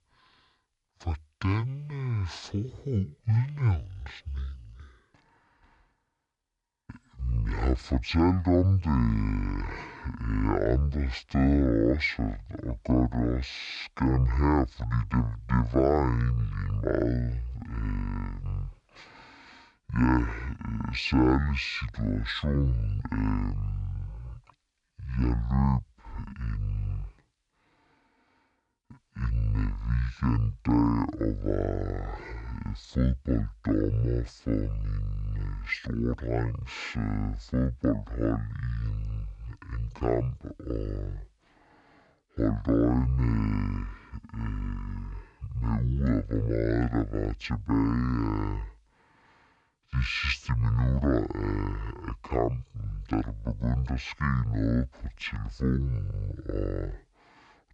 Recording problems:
wrong speed and pitch; too slow and too low; 0.5 times normal speed

